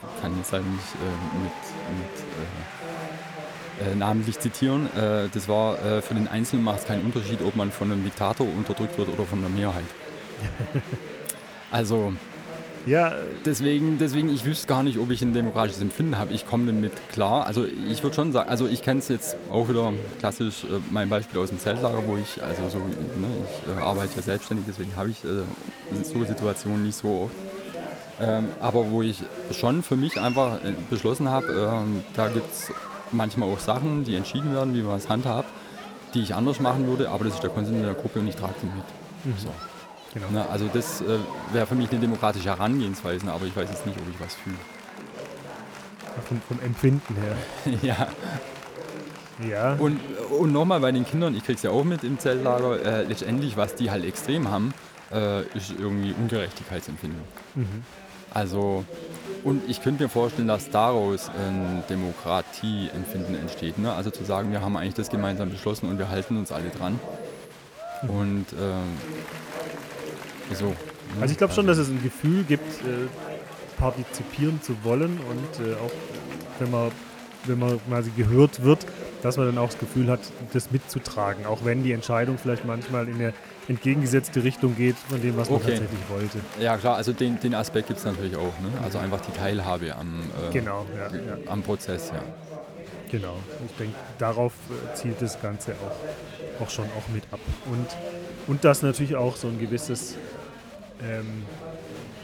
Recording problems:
chatter from many people; noticeable; throughout; 10 dB below the speech

